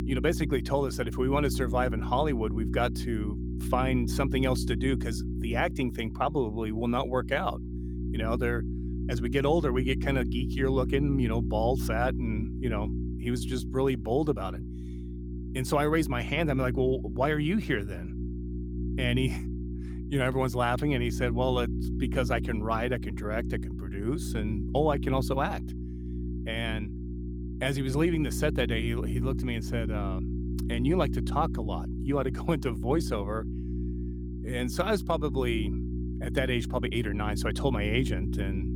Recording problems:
electrical hum; noticeable; throughout; 60 Hz, 10 dB below the speech

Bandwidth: 18.5 kHz